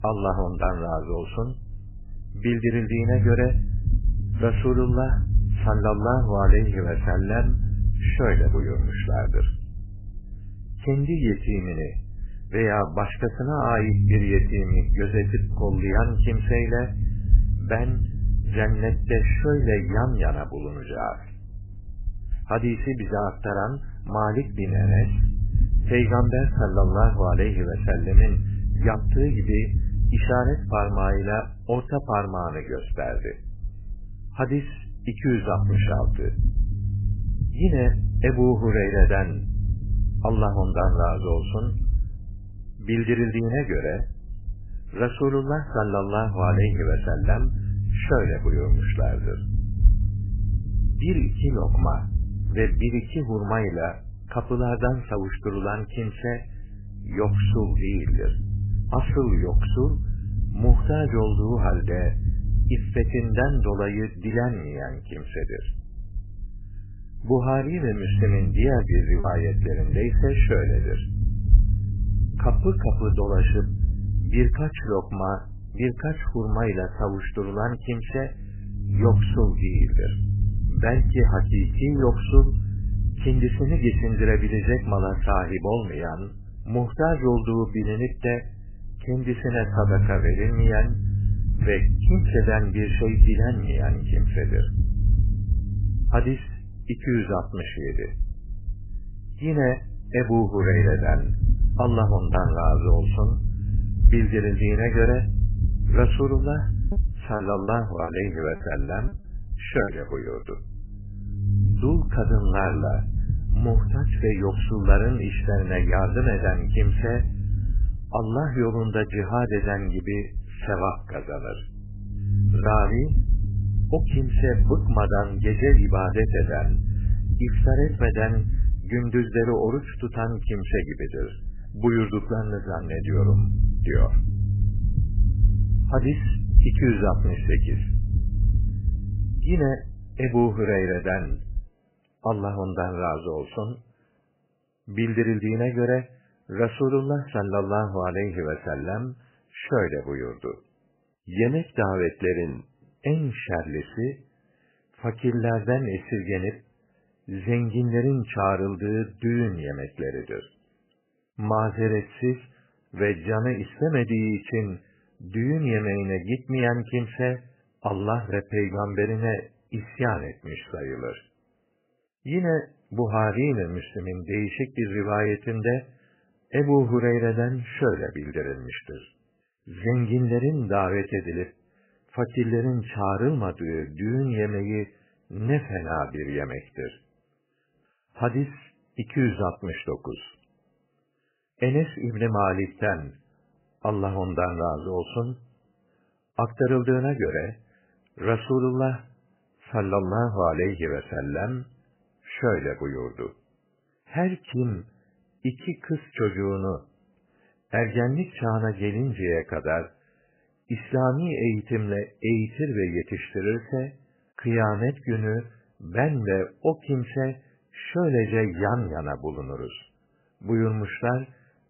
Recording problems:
garbled, watery; badly; nothing above 3 kHz
low rumble; noticeable; until 2:22; 10 dB below the speech
choppy; very; at 1:09 and from 1:47 to 1:50; 9% of the speech affected

